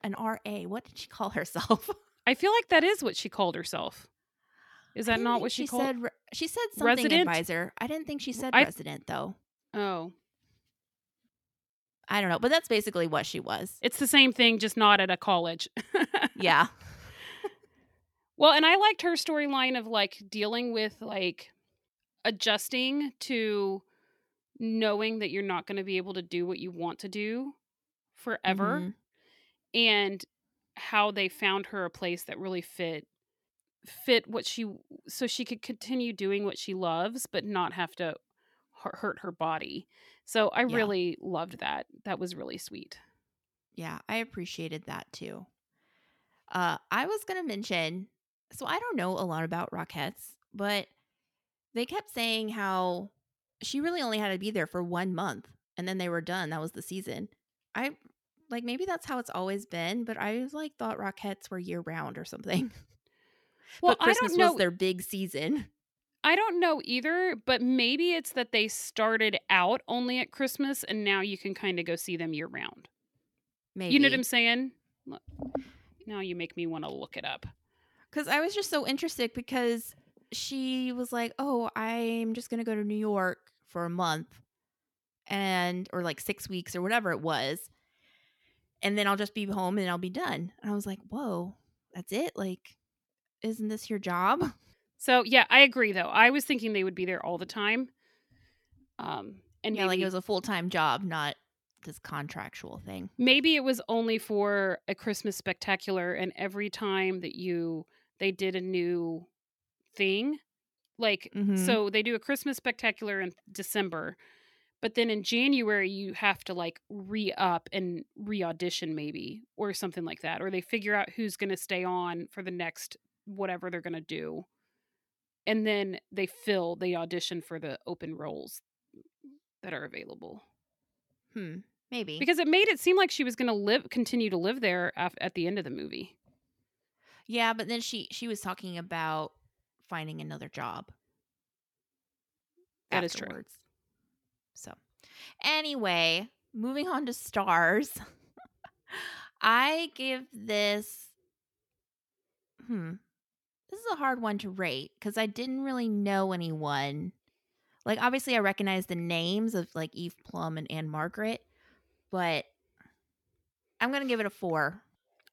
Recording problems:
none

